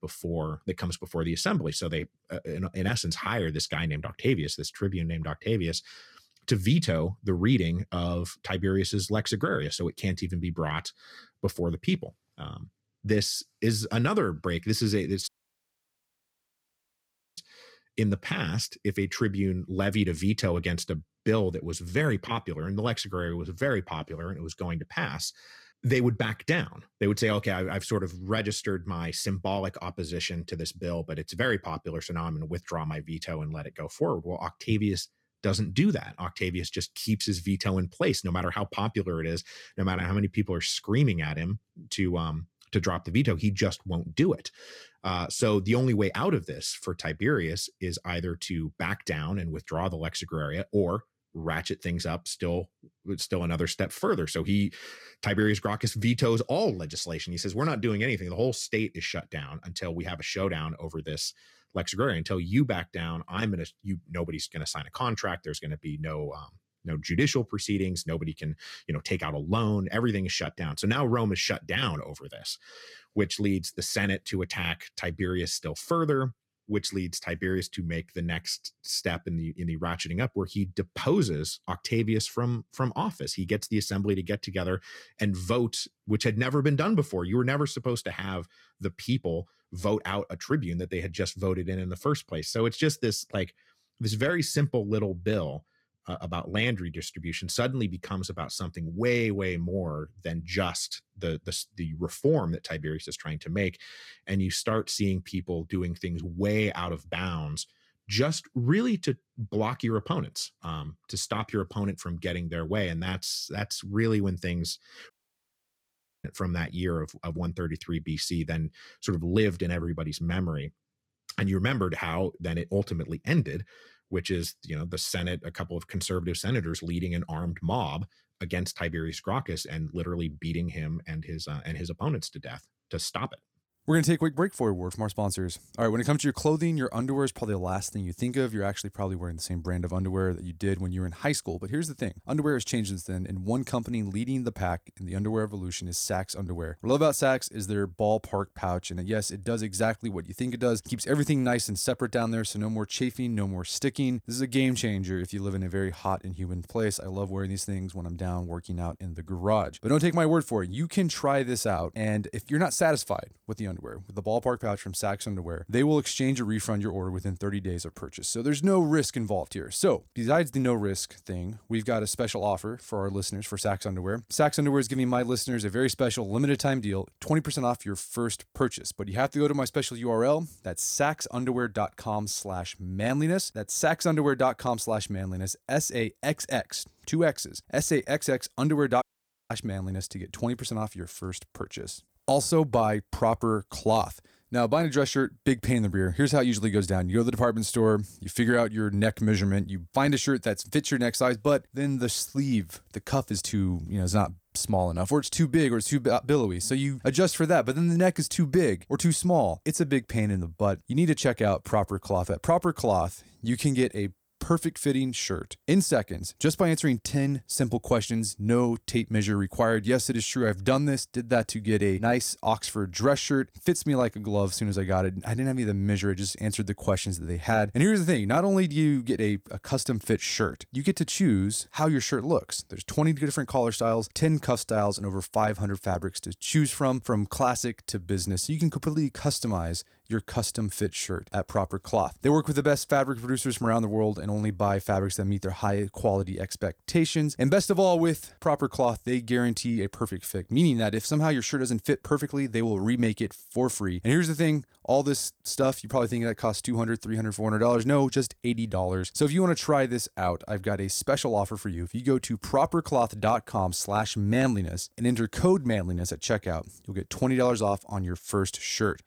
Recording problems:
audio cutting out; at 15 s for 2 s, at 1:55 for 1 s and at 3:09

